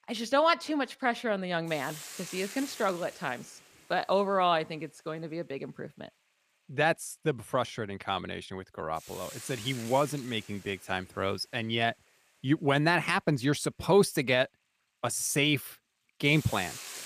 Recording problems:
hiss; noticeable; throughout; 15 dB below the speech

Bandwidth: 15 kHz